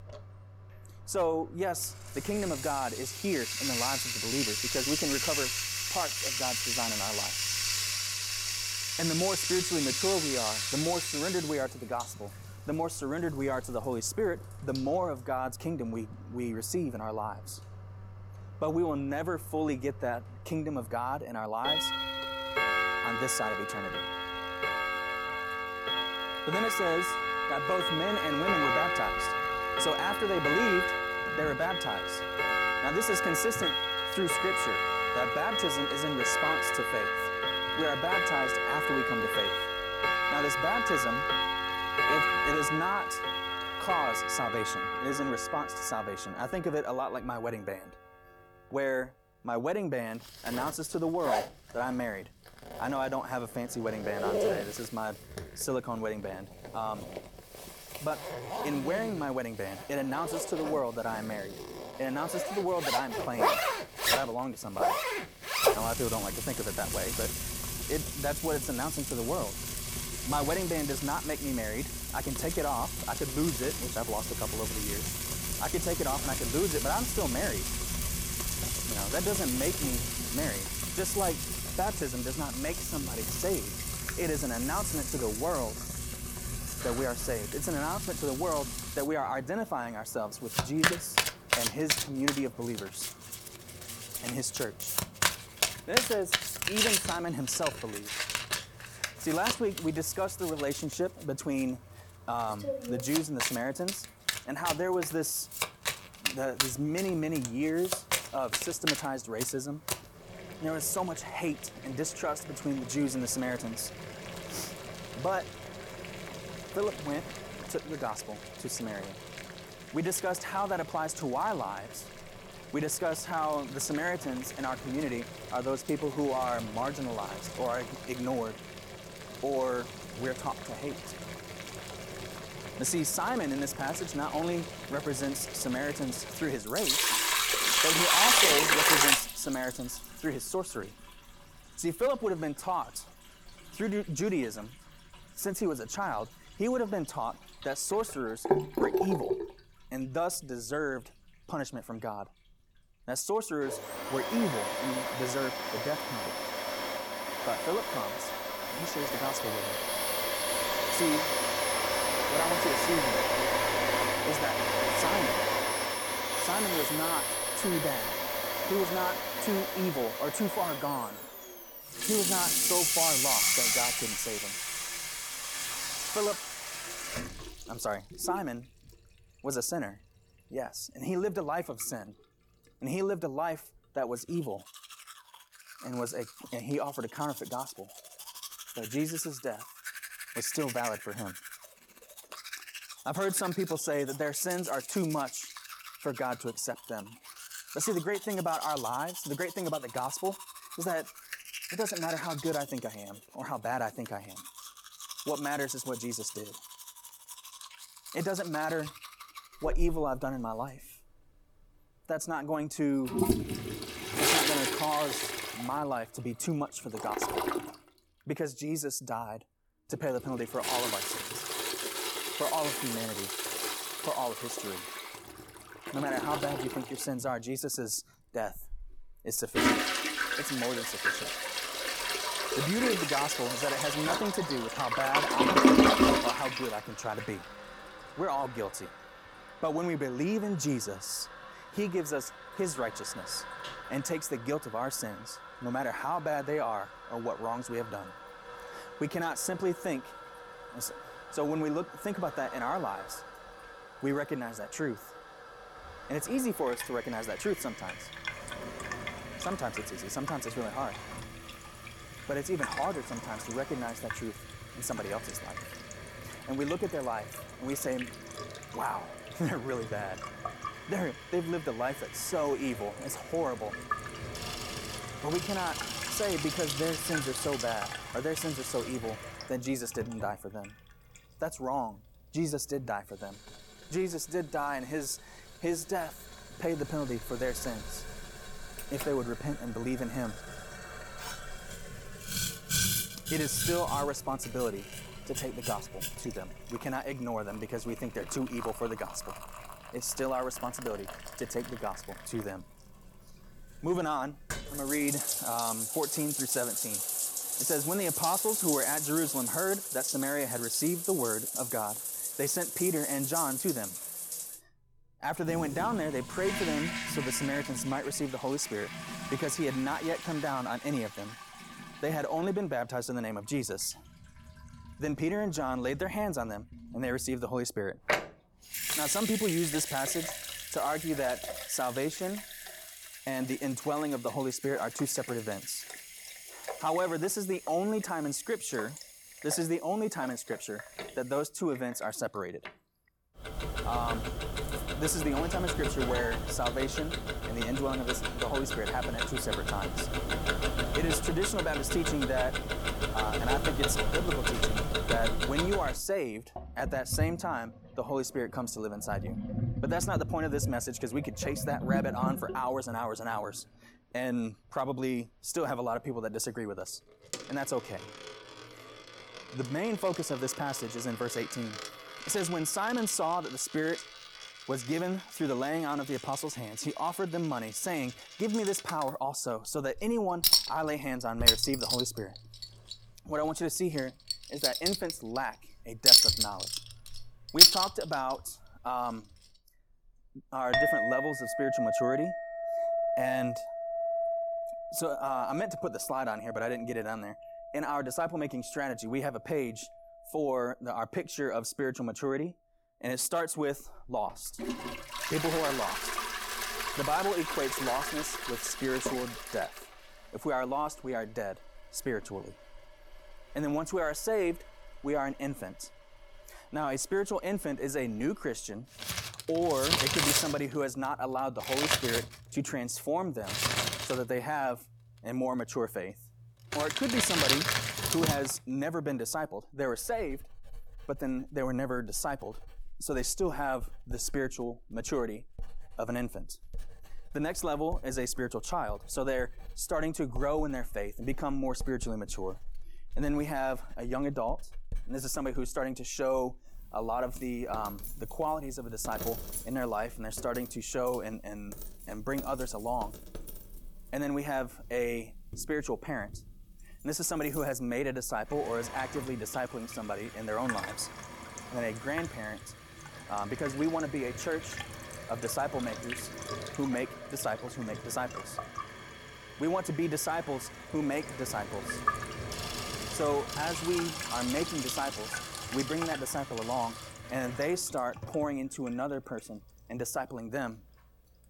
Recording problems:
household noises; very loud; throughout; 2 dB above the speech

